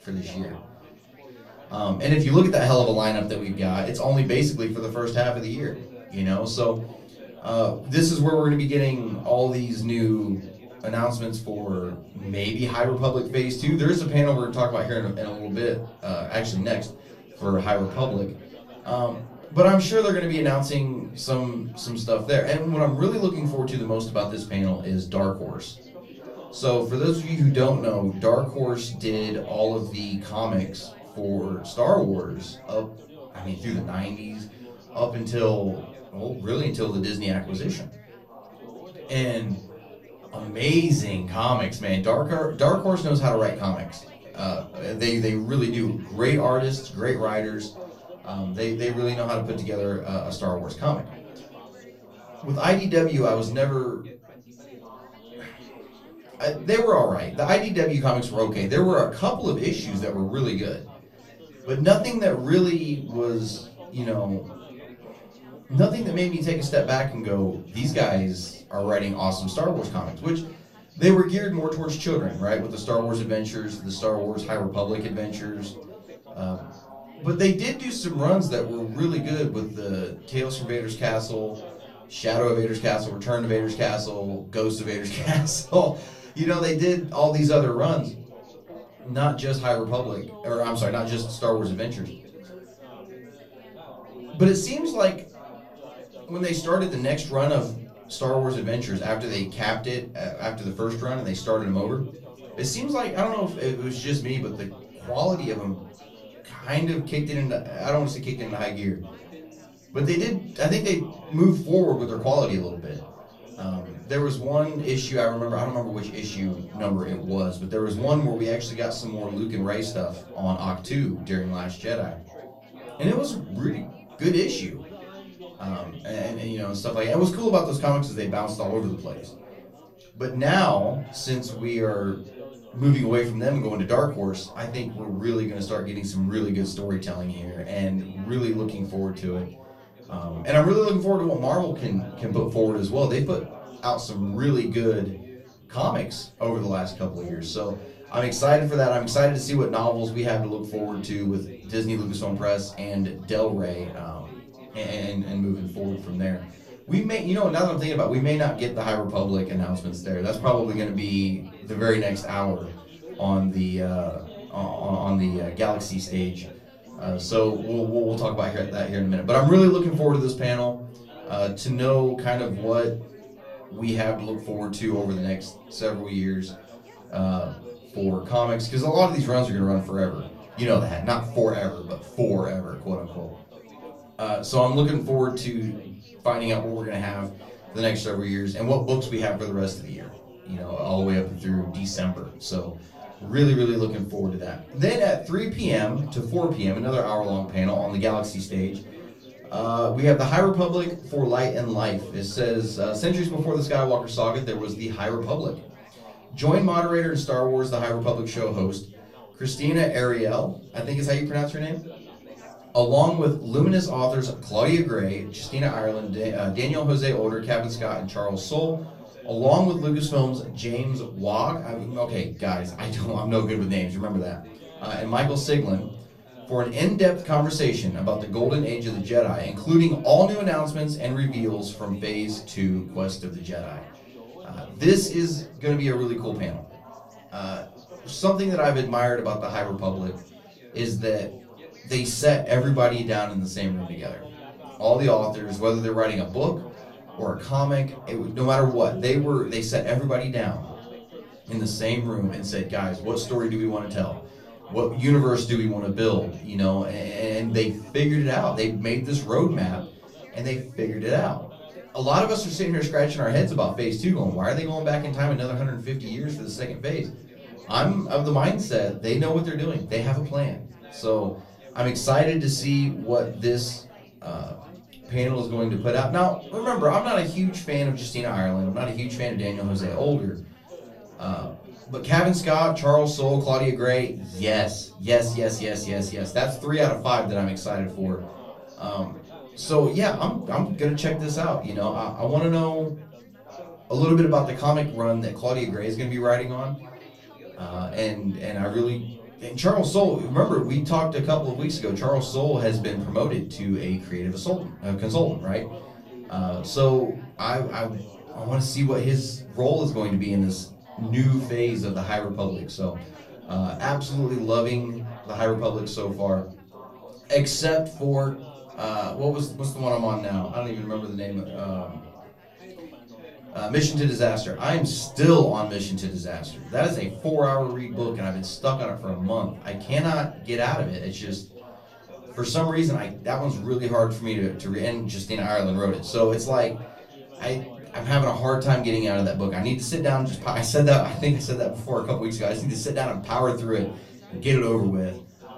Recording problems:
off-mic speech; far
room echo; very slight; dies away in 0.3 s
chatter from many people; faint; throughout; 20 dB below the speech

